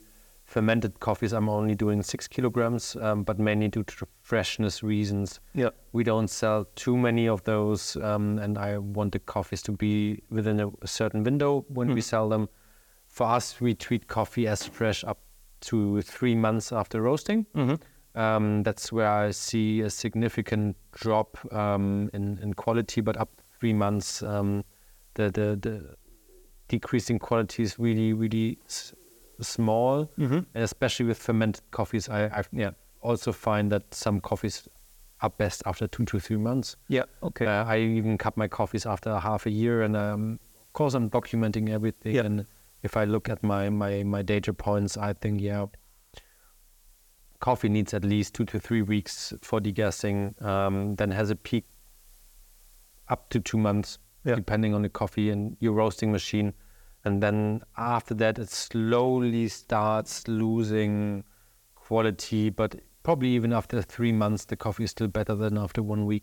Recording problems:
hiss; faint; throughout; 30 dB below the speech

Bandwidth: 18 kHz